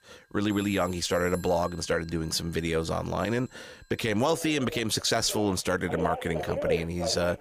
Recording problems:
alarms or sirens; loud; throughout; 8 dB below the speech

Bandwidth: 15 kHz